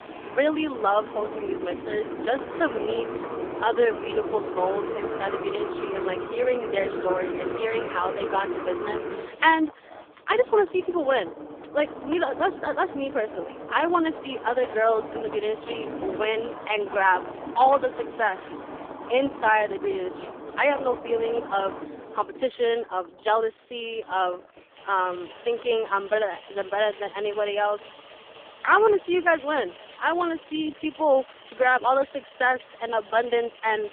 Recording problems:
phone-call audio; poor line; nothing above 3.5 kHz
traffic noise; loud; throughout; 10 dB below the speech

